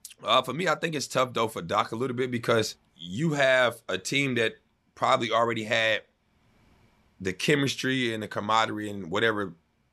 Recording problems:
none

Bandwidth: 13.5 kHz